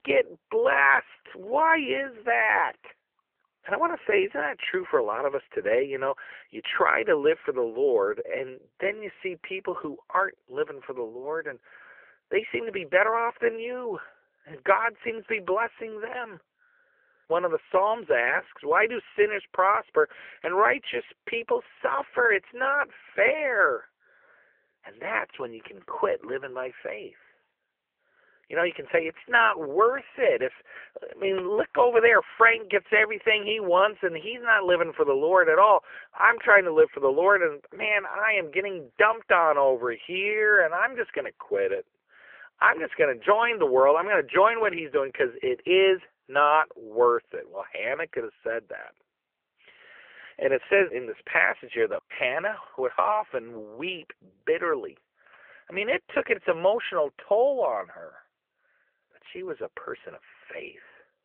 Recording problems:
phone-call audio; nothing above 3 kHz

